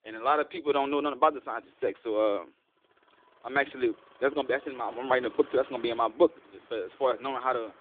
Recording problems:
phone-call audio
traffic noise; faint; throughout; 25 dB below the speech

